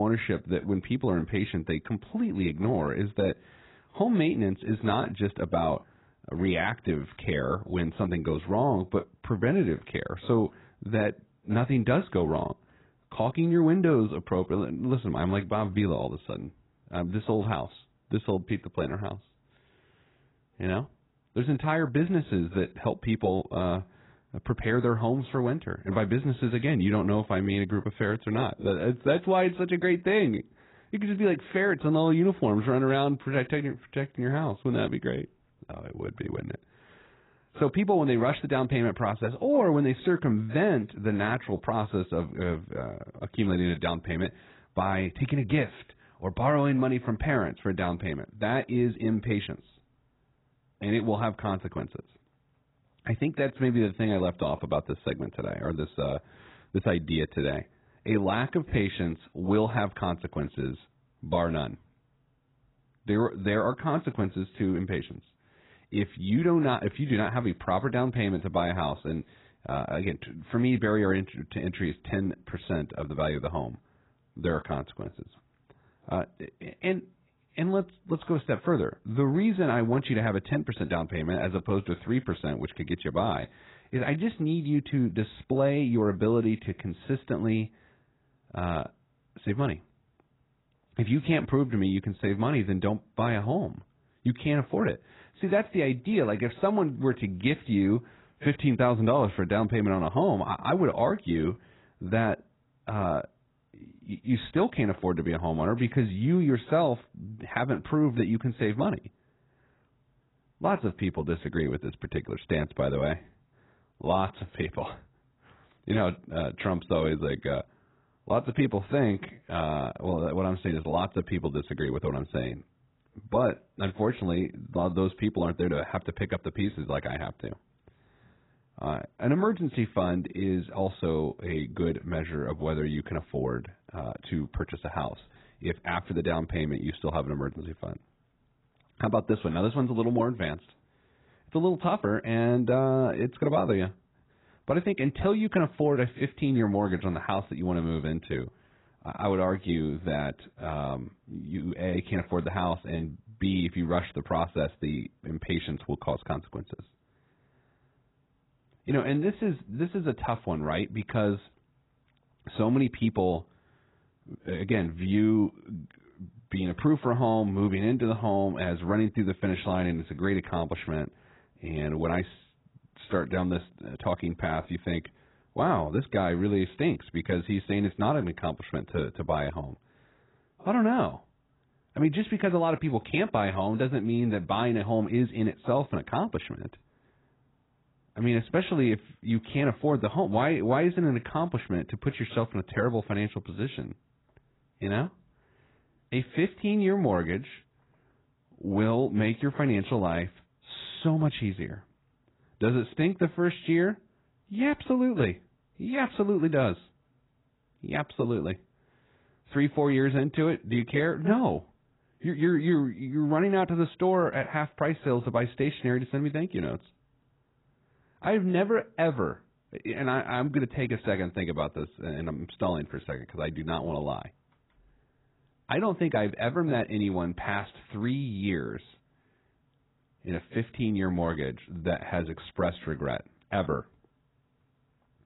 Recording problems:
garbled, watery; badly; nothing above 4 kHz
abrupt cut into speech; at the start

